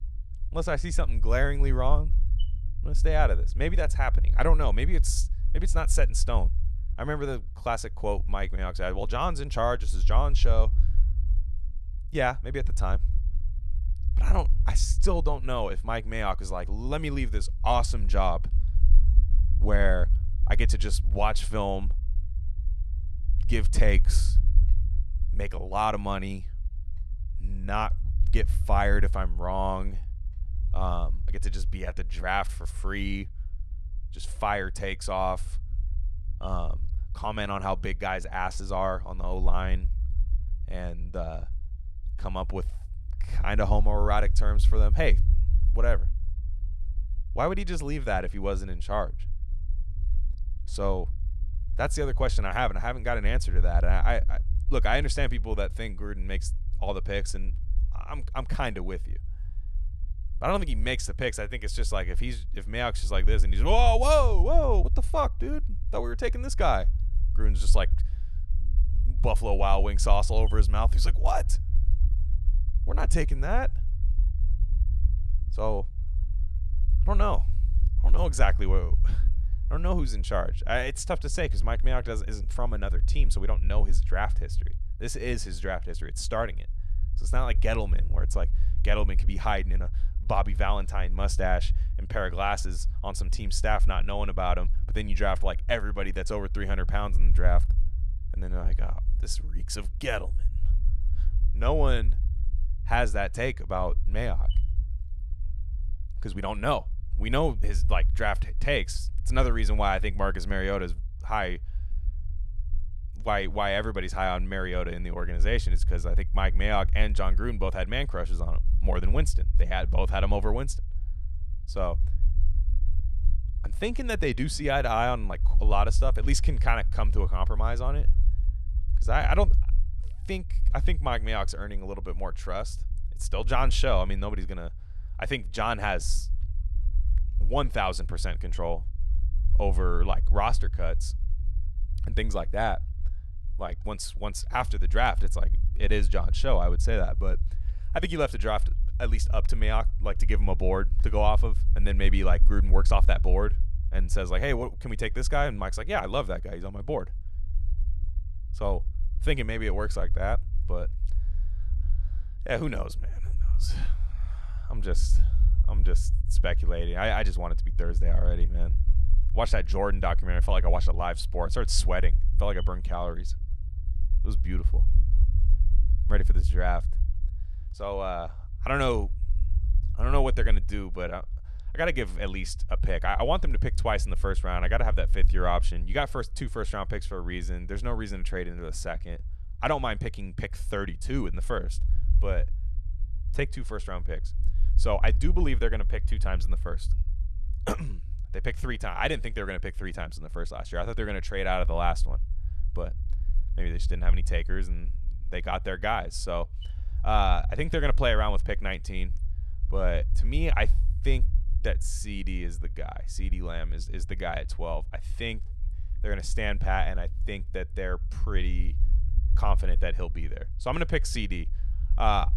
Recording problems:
low rumble; faint; throughout; 20 dB below the speech

